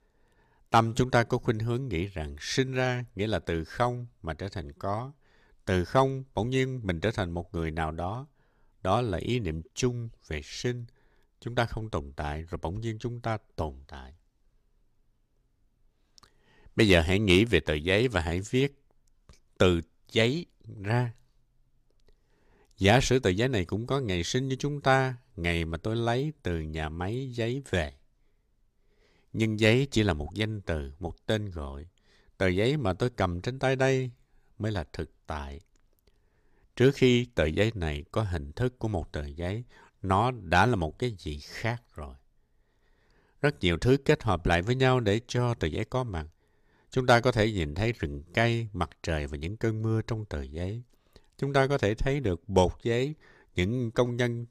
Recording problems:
none

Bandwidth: 14.5 kHz